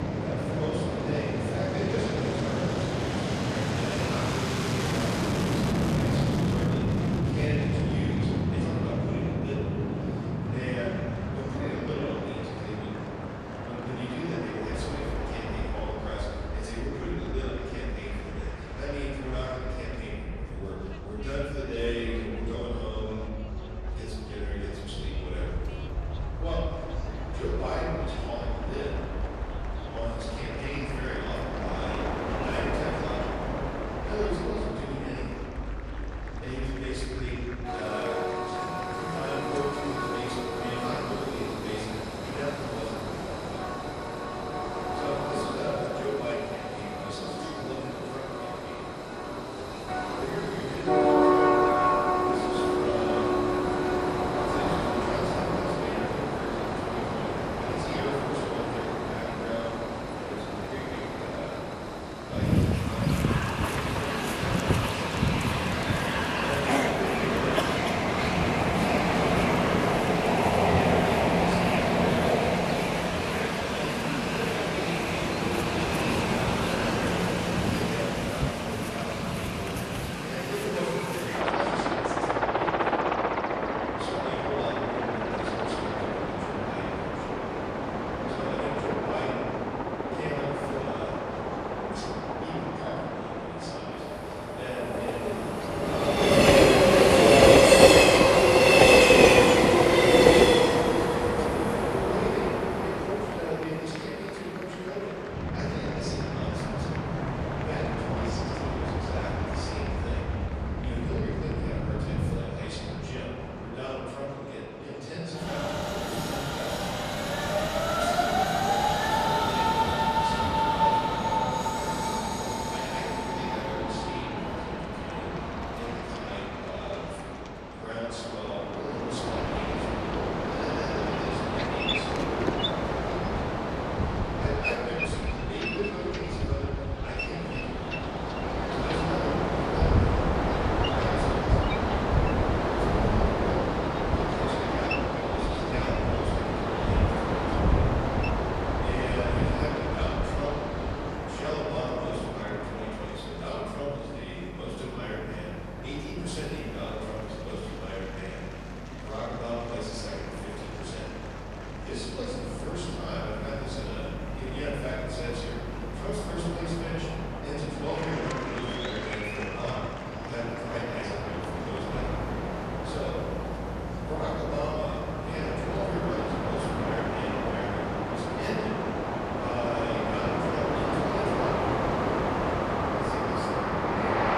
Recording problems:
room echo; strong; dies away in 2 s
off-mic speech; far
train or aircraft noise; very loud; throughout; 8 dB above the speech
murmuring crowd; loud; throughout; 10 dB below the speech

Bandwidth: 14 kHz